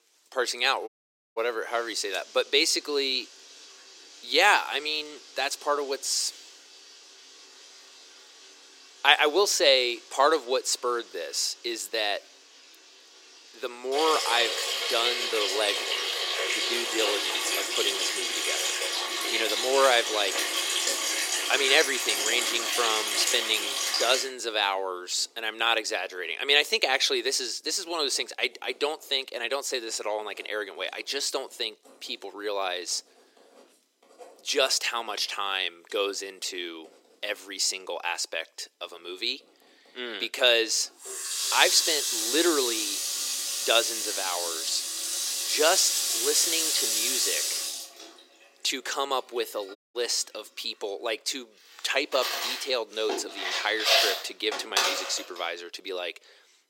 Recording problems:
thin; very; fading below 350 Hz
household noises; very loud; throughout; as loud as the speech
audio cutting out; at 1 s and at 50 s

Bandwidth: 16 kHz